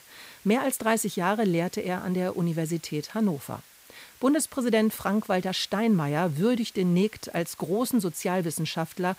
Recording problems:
hiss; faint; throughout; 25 dB below the speech

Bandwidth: 15.5 kHz